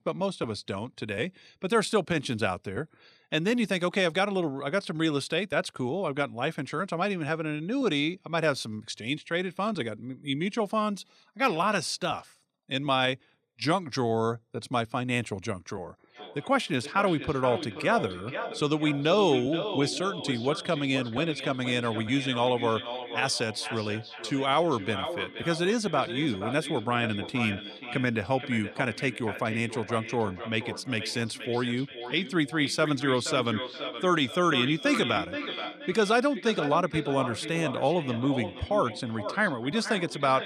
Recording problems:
echo of what is said; strong; from 16 s on; 480 ms later, 9 dB below the speech

